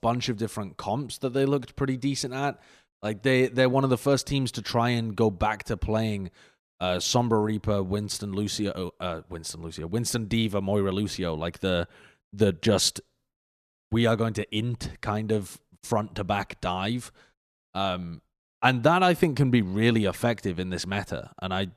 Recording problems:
none

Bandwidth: 14.5 kHz